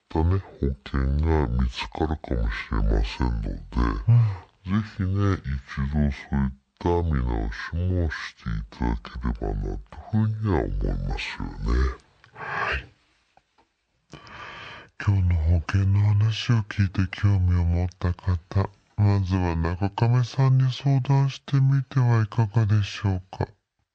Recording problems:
wrong speed and pitch; too slow and too low; 0.6 times normal speed

